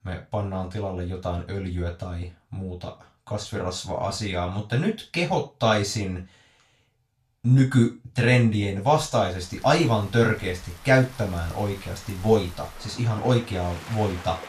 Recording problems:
off-mic speech; far
room echo; very slight; dies away in 0.3 s
rain or running water; noticeable; from 9.5 s on; 20 dB below the speech

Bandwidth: 14.5 kHz